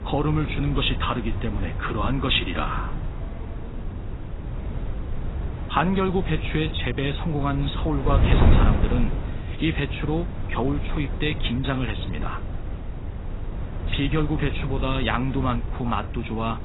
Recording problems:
garbled, watery; badly; nothing above 4 kHz
traffic noise; noticeable; until 3.5 s; 20 dB below the speech
wind noise on the microphone; occasional gusts; 10 dB below the speech

